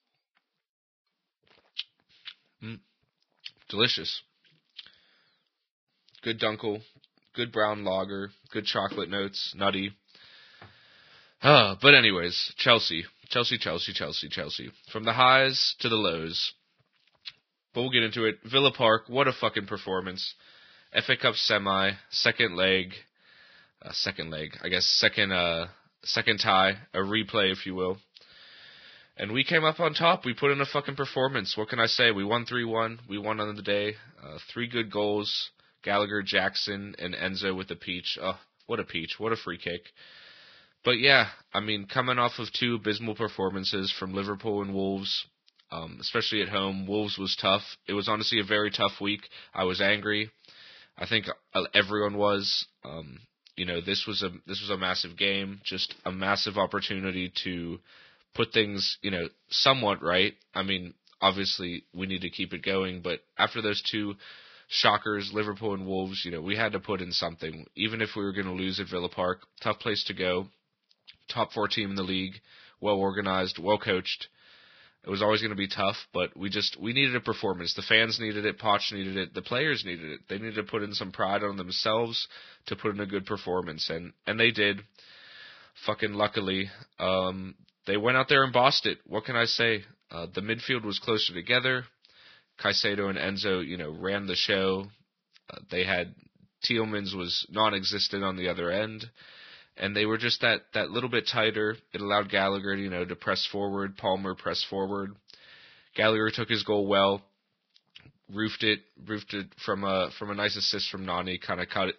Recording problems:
garbled, watery; badly; nothing above 5.5 kHz

